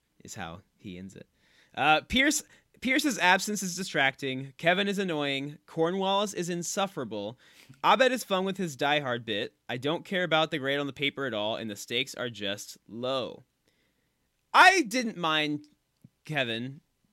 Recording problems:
none

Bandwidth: 16 kHz